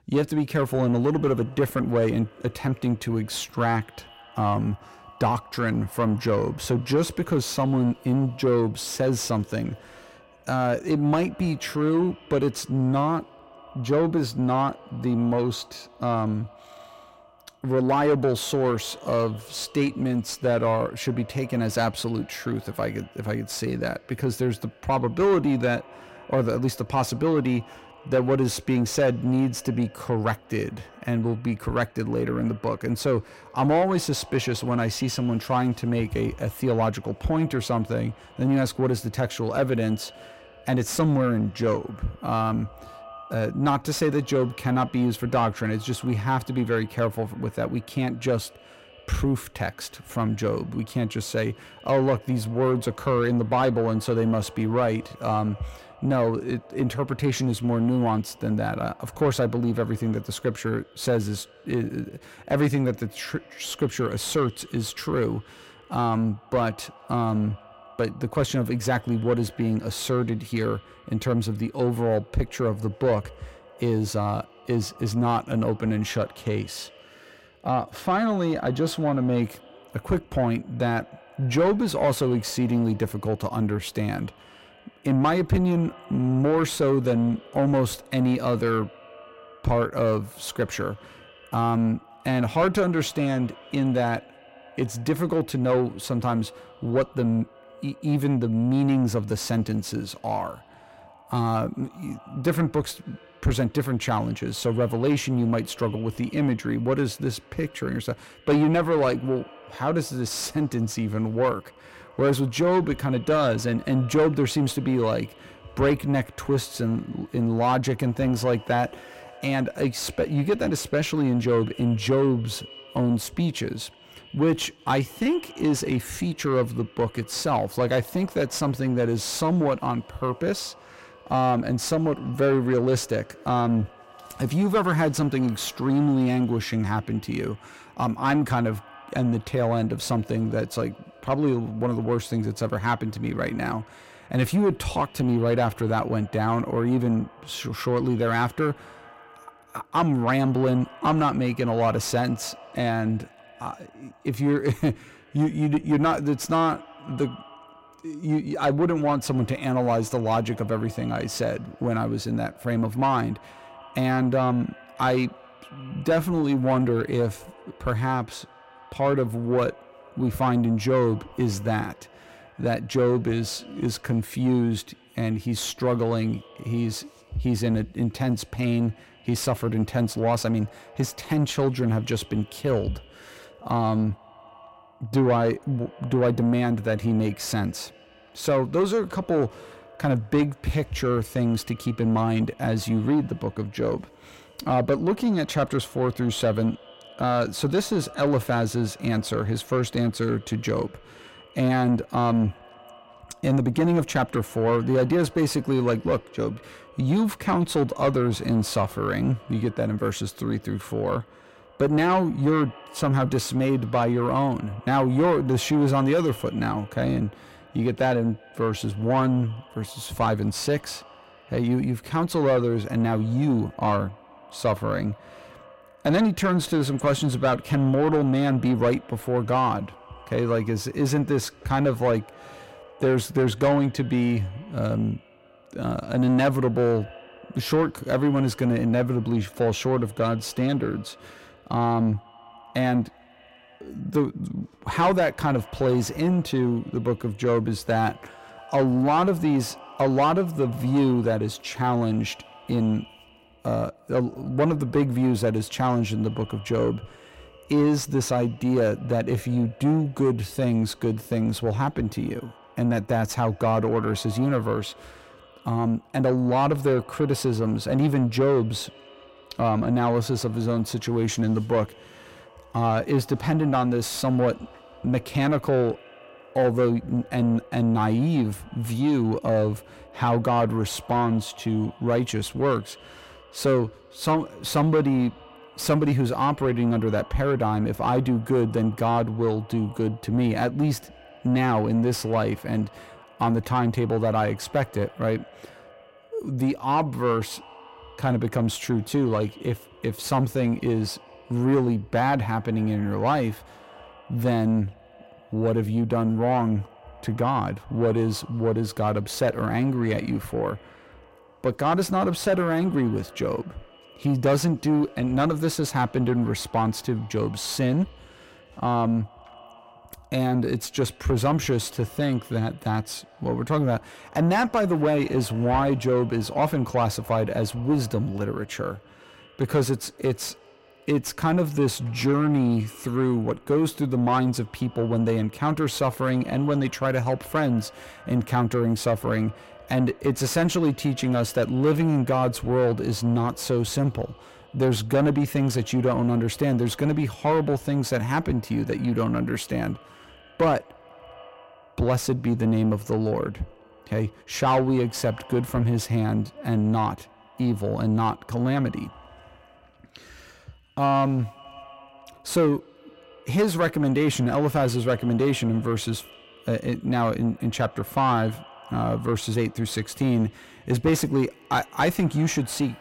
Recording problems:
echo of what is said; faint; throughout; 170 ms later, 25 dB below the speech
distortion; slight; 10 dB below the speech

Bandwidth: 16 kHz